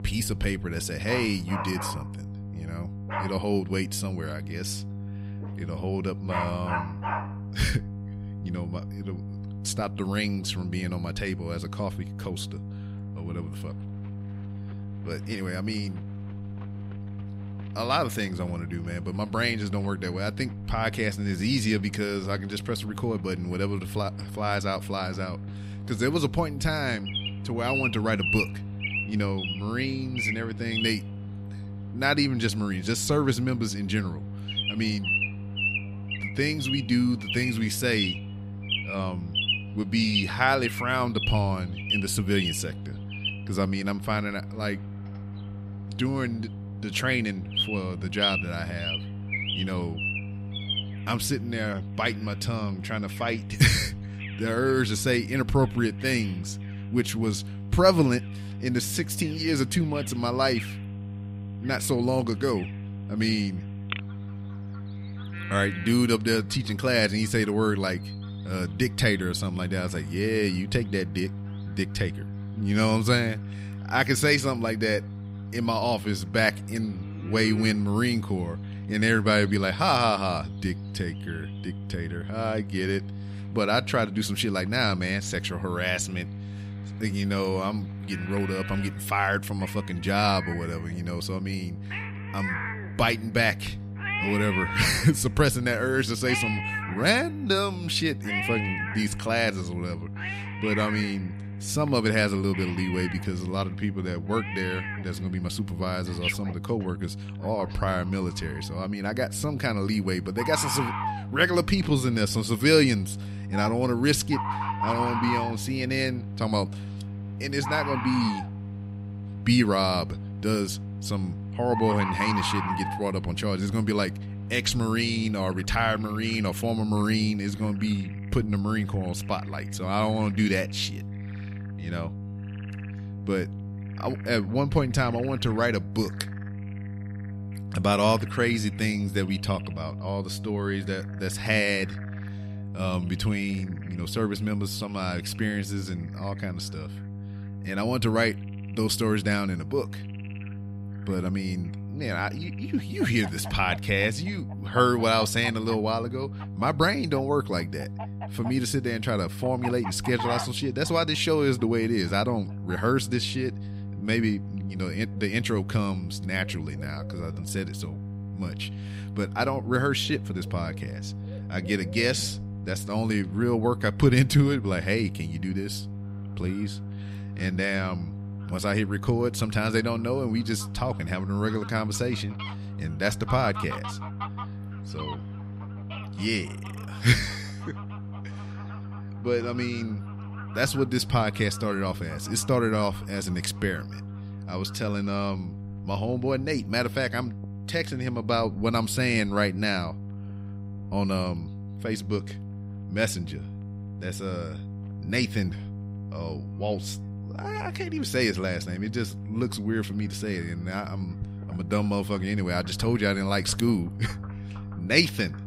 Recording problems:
animal sounds; loud; throughout; 6 dB below the speech
electrical hum; noticeable; throughout; 50 Hz, 20 dB below the speech

